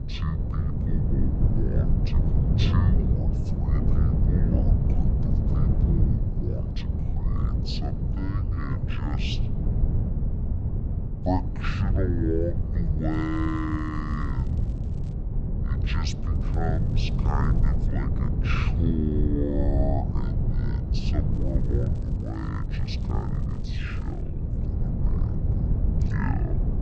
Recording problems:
wrong speed and pitch; too slow and too low; 0.5 times normal speed
wind noise on the microphone; heavy; 3 dB below the speech
crackling; faint; from 13 to 15 s, from 16 to 18 s and from 21 to 24 s; 30 dB below the speech

